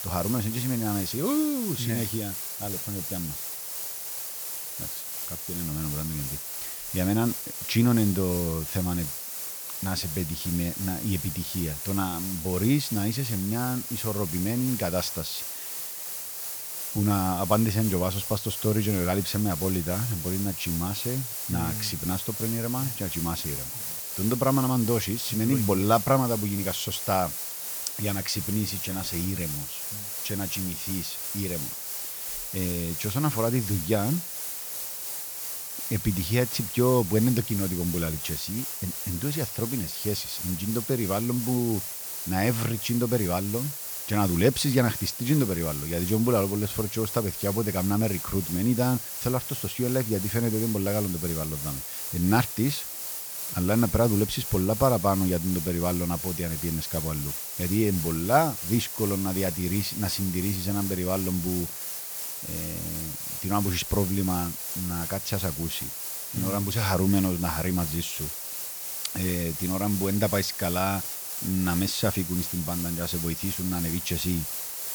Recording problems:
hiss; loud; throughout; 3 dB below the speech

